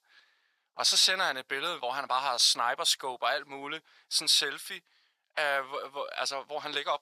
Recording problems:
thin; very; fading below 950 Hz

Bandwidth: 14.5 kHz